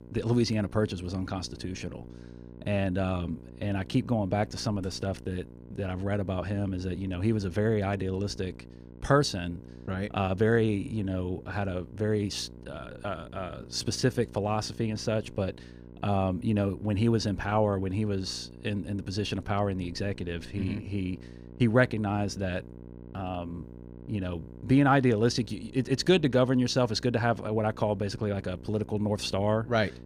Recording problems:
electrical hum; faint; throughout; 60 Hz, 20 dB below the speech

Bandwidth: 15.5 kHz